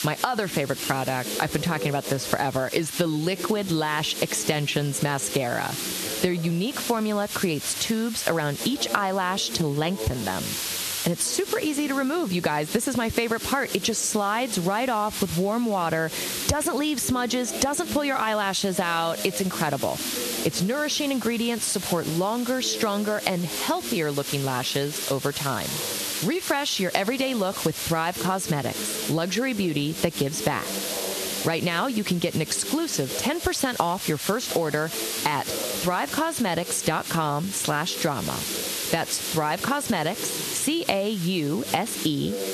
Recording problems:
squashed, flat; somewhat, background pumping
hiss; loud; throughout; 7 dB below the speech
background chatter; noticeable; throughout; 4 voices, 15 dB below the speech

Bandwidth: 13.5 kHz